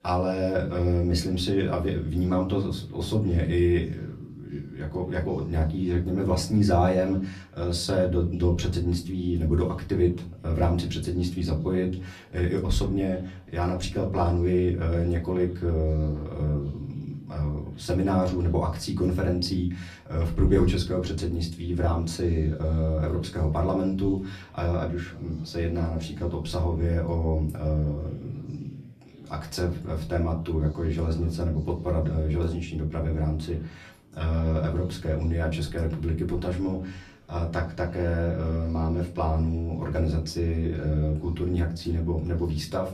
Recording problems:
off-mic speech; far
room echo; very slight; dies away in 0.4 s
background chatter; faint; throughout; 3 voices, 30 dB below the speech

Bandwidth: 14.5 kHz